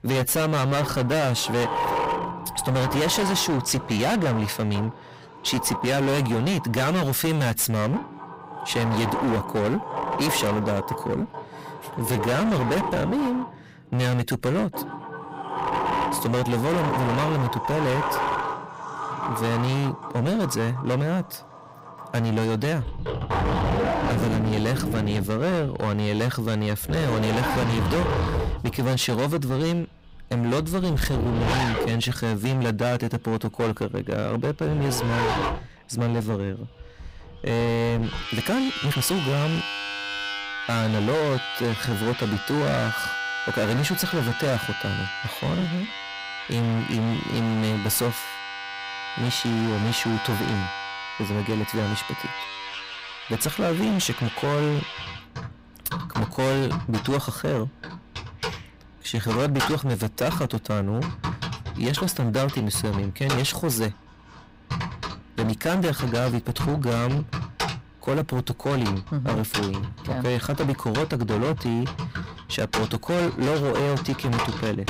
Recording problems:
distortion; heavy; 25% of the sound clipped
household noises; loud; throughout; 5 dB below the speech
uneven, jittery; strongly; from 12 to 59 s

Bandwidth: 15.5 kHz